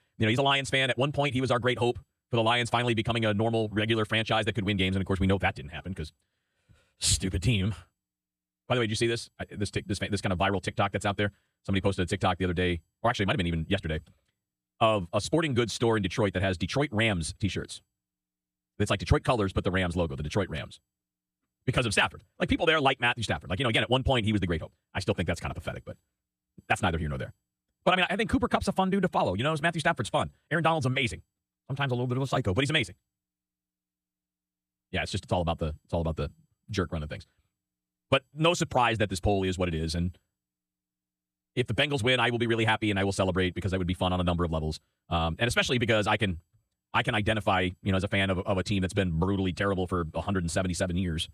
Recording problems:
wrong speed, natural pitch; too fast; 1.5 times normal speed

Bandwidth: 15 kHz